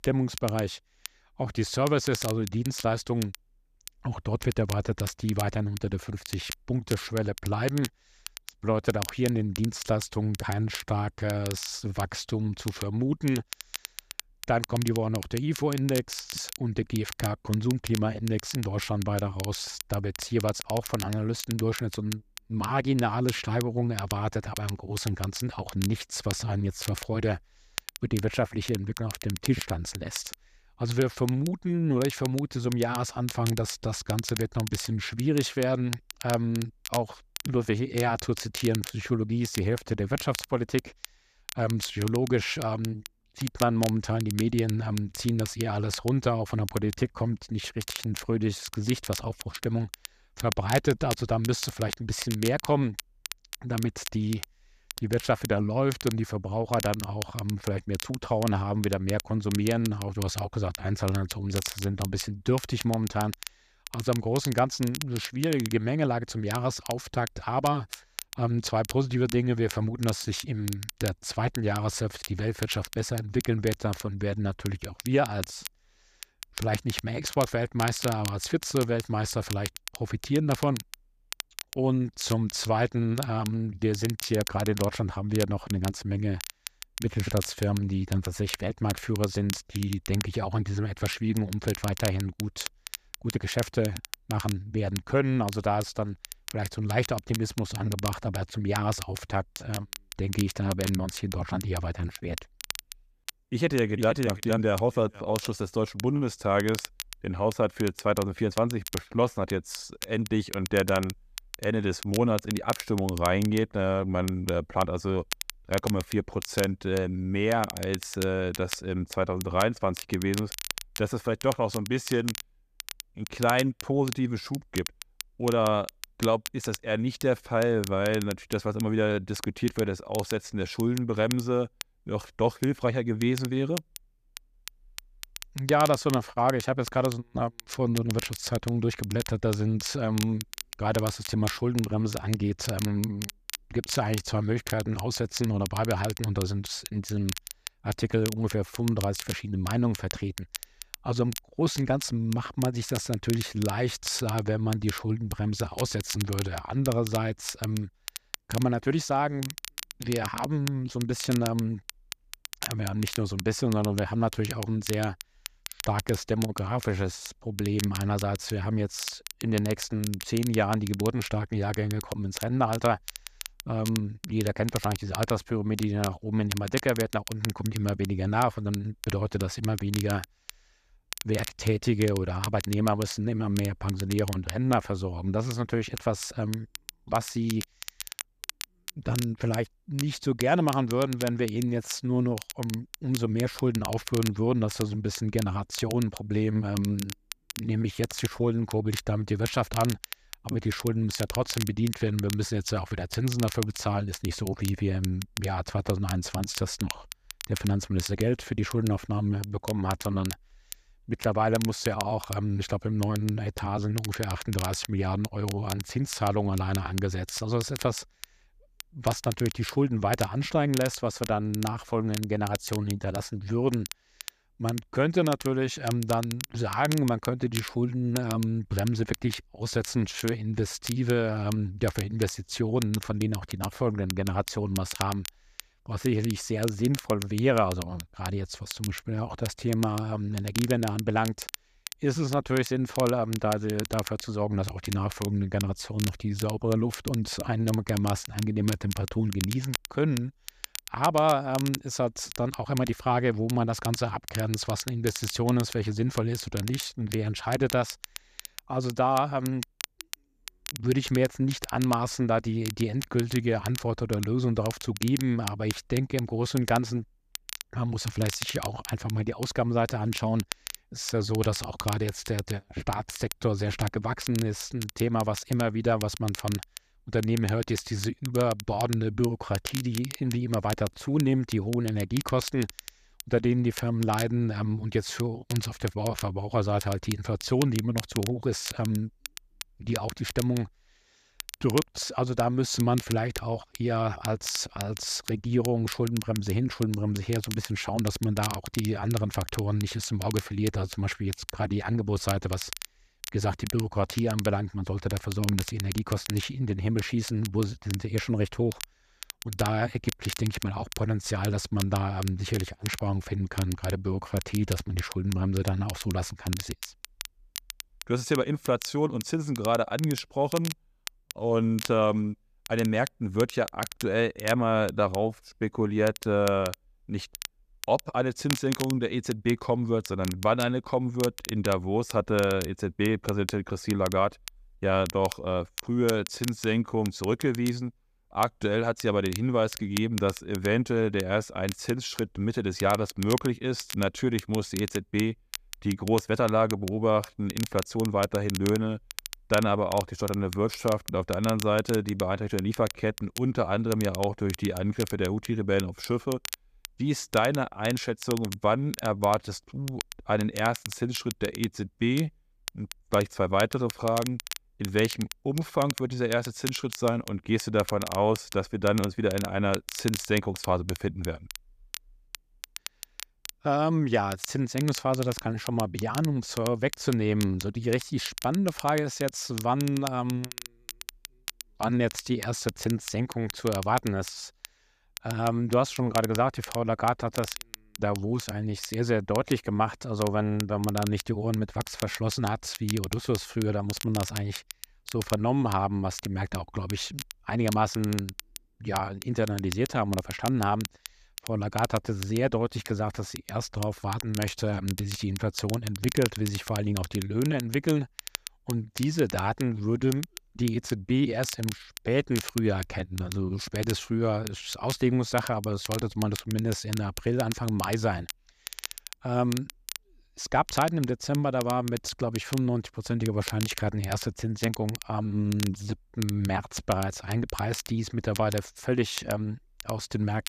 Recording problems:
crackle, like an old record; noticeable; 10 dB below the speech

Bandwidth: 14.5 kHz